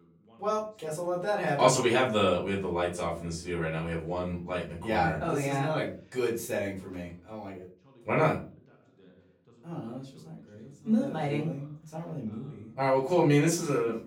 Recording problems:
off-mic speech; far
room echo; slight; dies away in 0.3 s
voice in the background; faint; throughout; 30 dB below the speech

